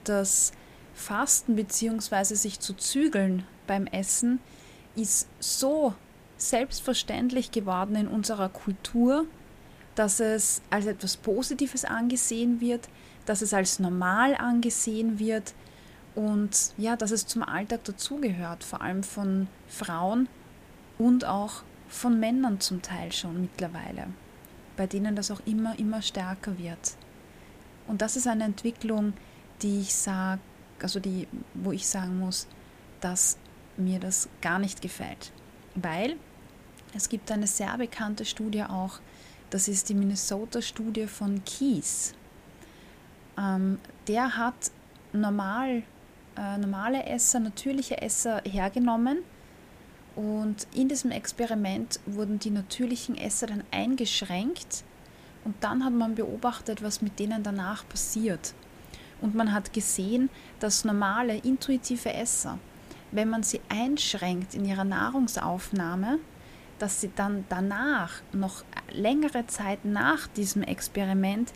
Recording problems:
hiss; faint; throughout; 25 dB below the speech

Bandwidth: 15 kHz